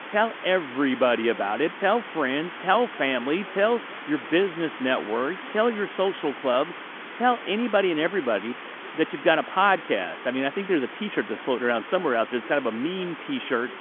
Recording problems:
phone-call audio; nothing above 3.5 kHz
hiss; noticeable; throughout; 10 dB below the speech
voice in the background; faint; throughout; 25 dB below the speech

